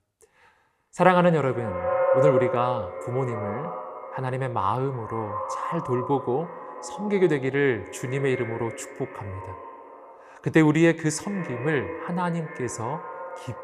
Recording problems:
echo of what is said; strong; throughout; 220 ms later, 6 dB below the speech

